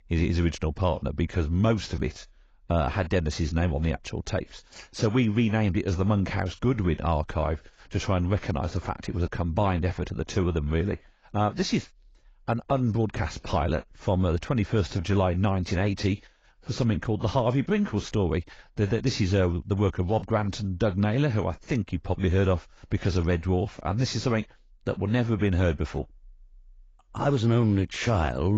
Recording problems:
garbled, watery; badly; nothing above 17.5 kHz
abrupt cut into speech; at the end

